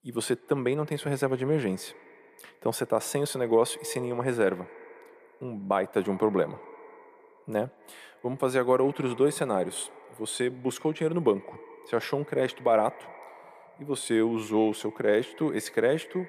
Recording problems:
echo of what is said; faint; throughout; 120 ms later, 20 dB below the speech

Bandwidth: 15 kHz